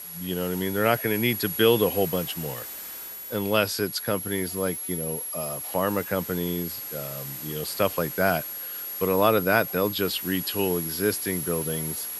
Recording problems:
high-pitched whine; loud; throughout; 11.5 kHz, 6 dB below the speech
hiss; noticeable; throughout; 15 dB below the speech

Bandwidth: 15 kHz